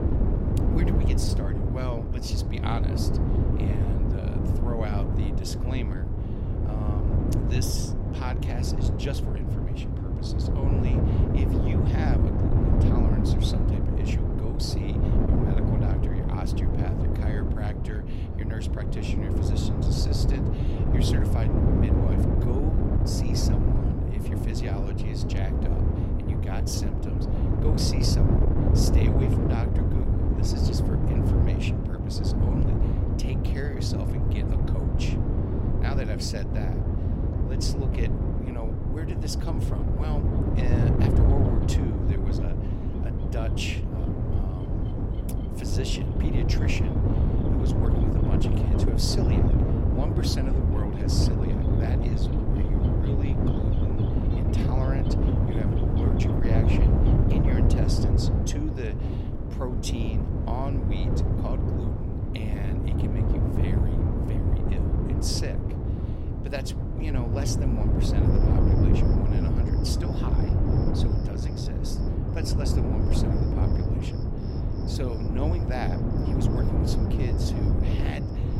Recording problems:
wind noise on the microphone; heavy; 3 dB above the speech
animal sounds; faint; throughout; 20 dB below the speech

